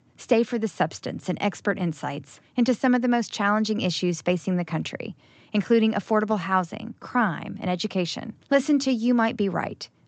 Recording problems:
high frequencies cut off; noticeable; nothing above 8 kHz

